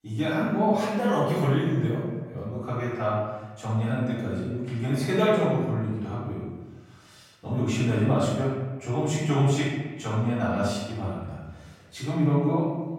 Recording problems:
room echo; strong; dies away in 1.1 s
off-mic speech; far

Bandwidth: 16 kHz